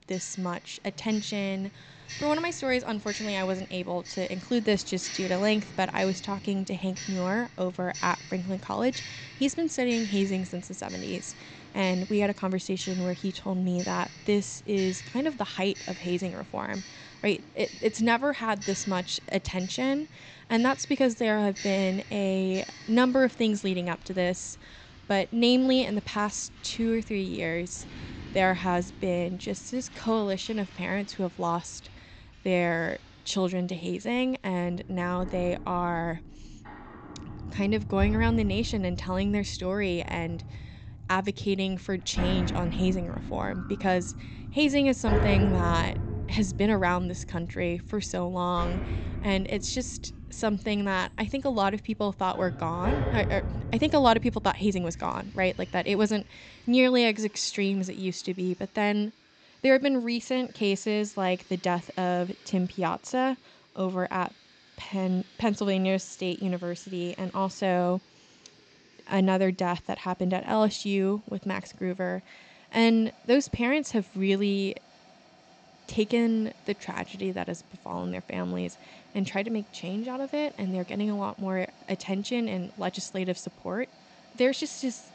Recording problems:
high frequencies cut off; noticeable; nothing above 8 kHz
household noises; noticeable; throughout; 10 dB below the speech

